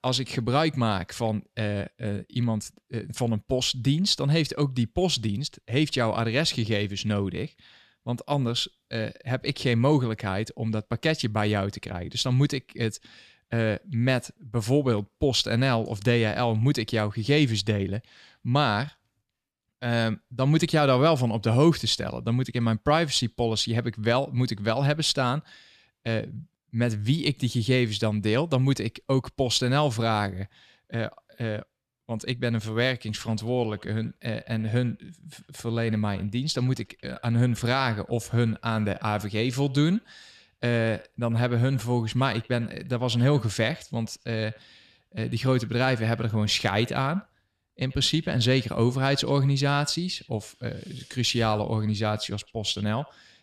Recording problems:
echo of what is said; faint; from 33 s on; 90 ms later, 25 dB below the speech

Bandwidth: 14 kHz